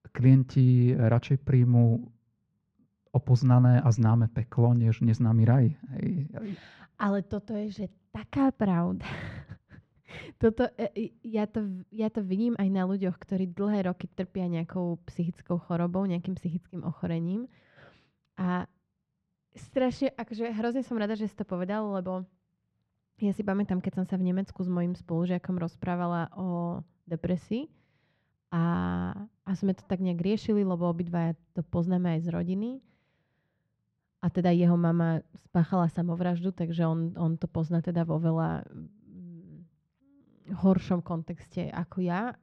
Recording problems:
muffled; slightly; fading above 2.5 kHz

